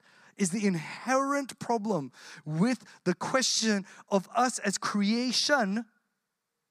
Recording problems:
none

